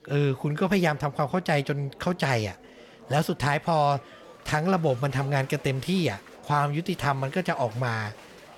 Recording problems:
murmuring crowd; faint; throughout; 20 dB below the speech

